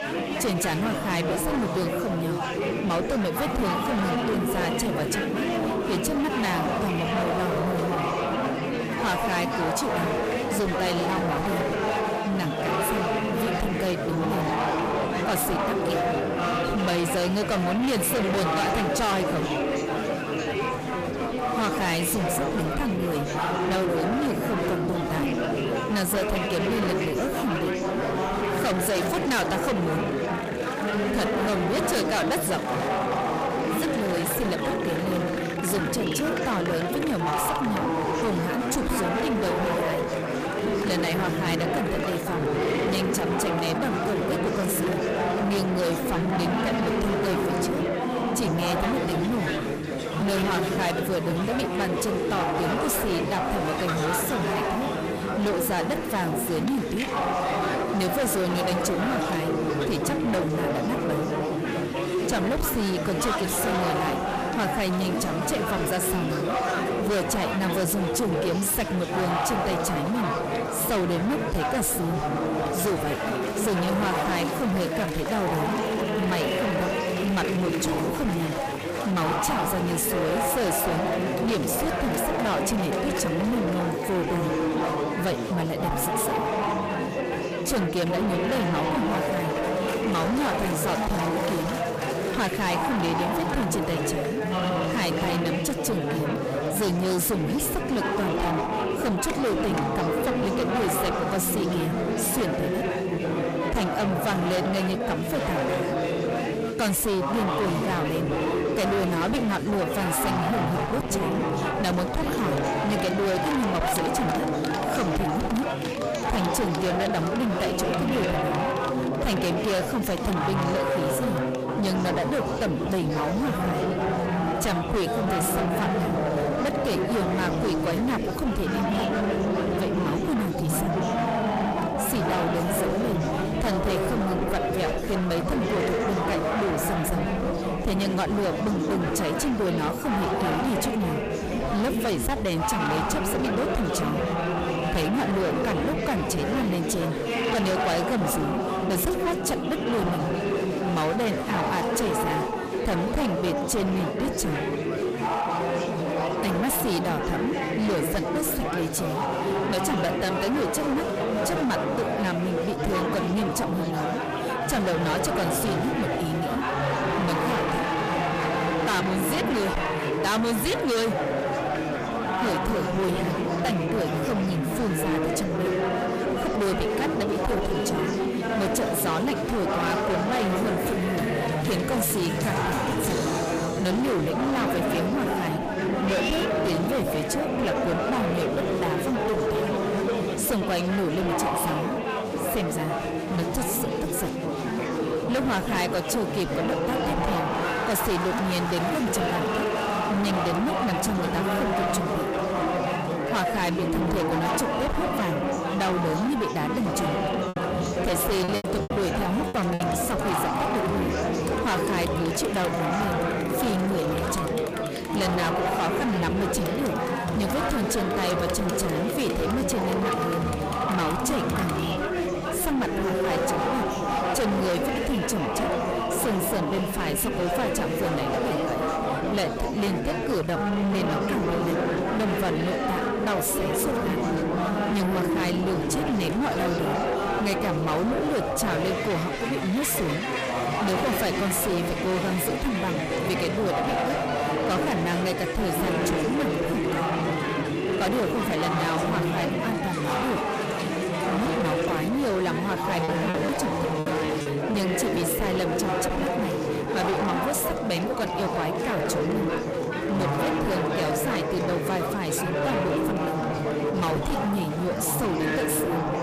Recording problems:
distortion; heavy; 29% of the sound clipped
chatter from many people; very loud; throughout; 1 dB above the speech
choppy; very; from 3:28 to 3:30 and from 4:13 to 4:15; 13% of the speech affected

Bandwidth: 15 kHz